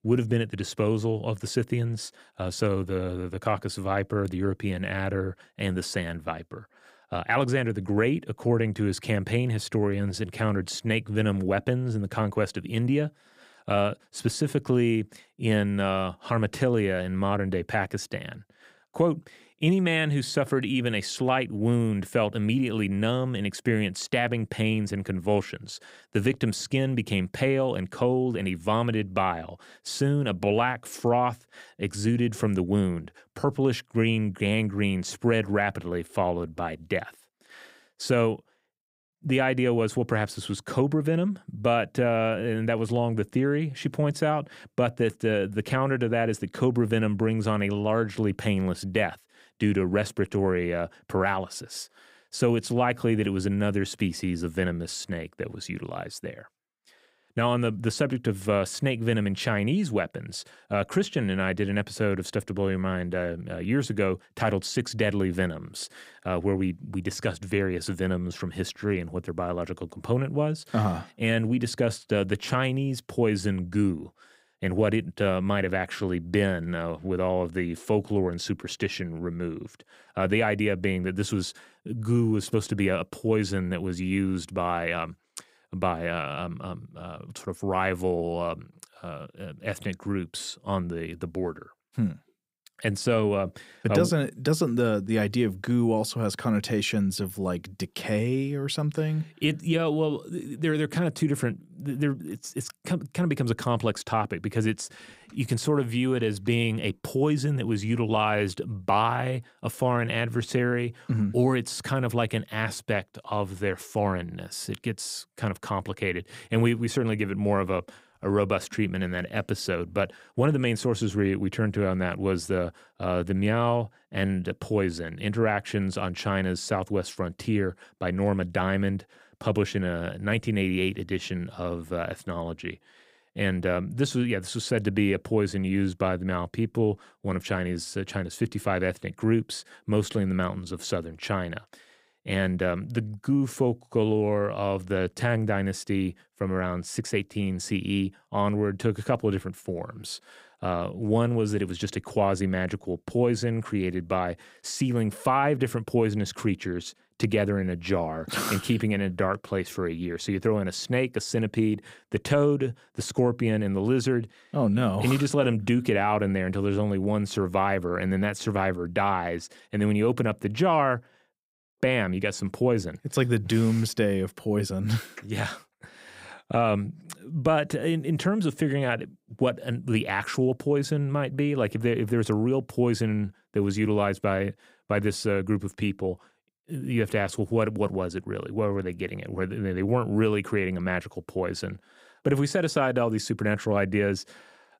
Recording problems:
none

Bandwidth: 15.5 kHz